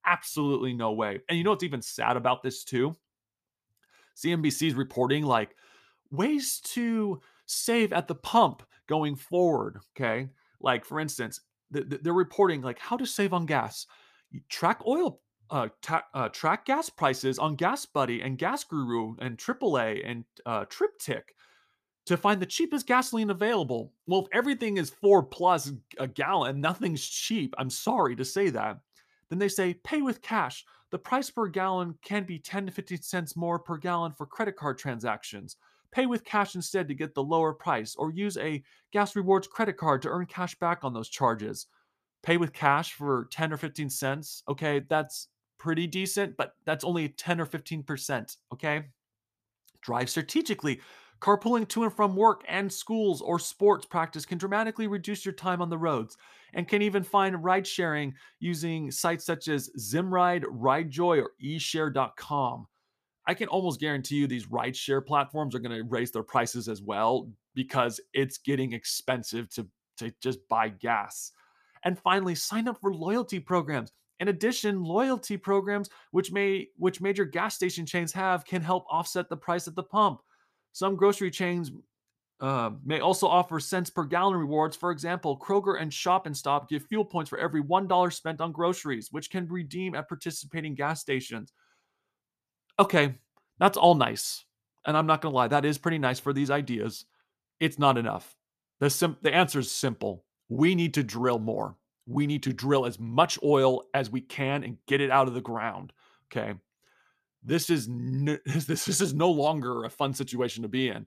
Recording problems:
none

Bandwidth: 14.5 kHz